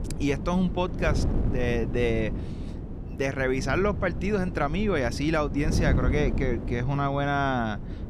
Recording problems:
wind noise on the microphone; occasional gusts; 10 dB below the speech

